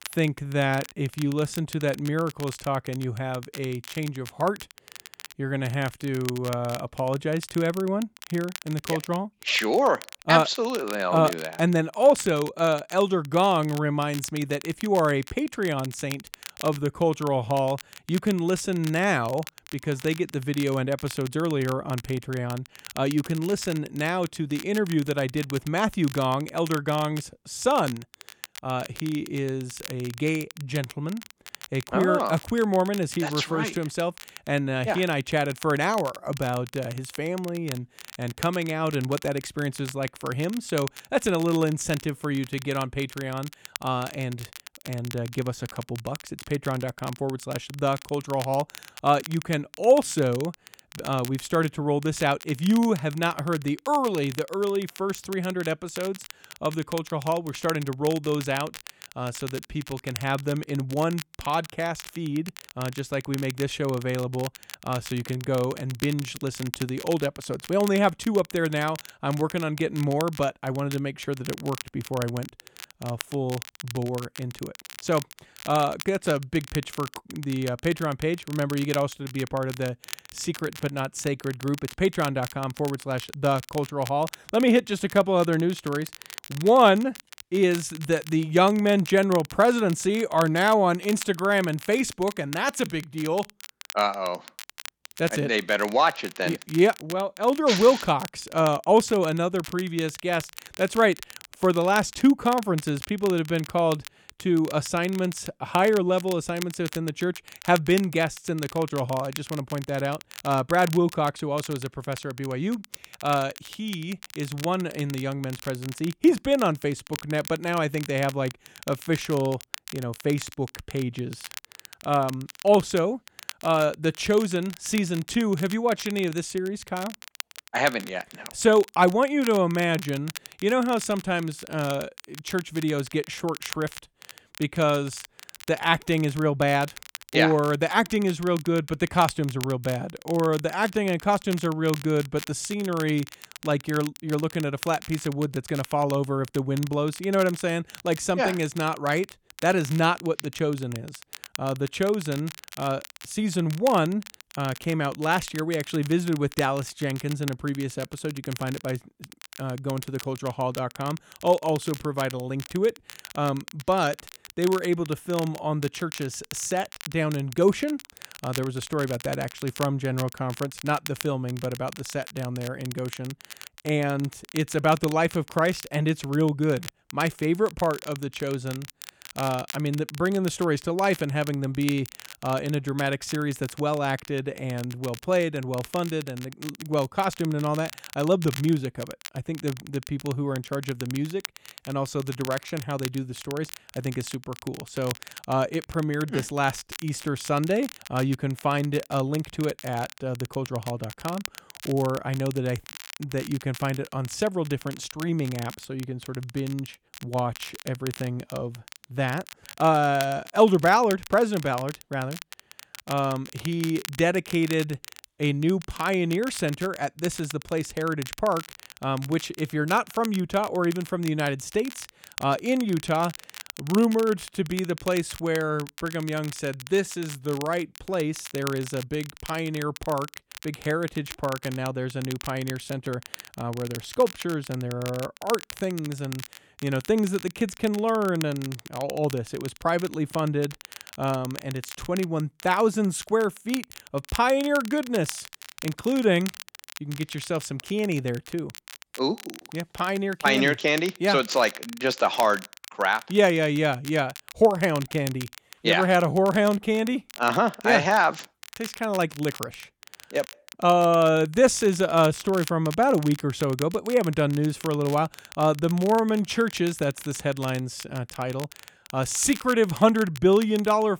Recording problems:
crackle, like an old record; noticeable; 15 dB below the speech

